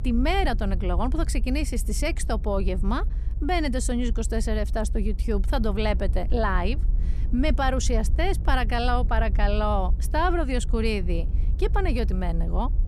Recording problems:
low rumble; noticeable; throughout; 20 dB below the speech

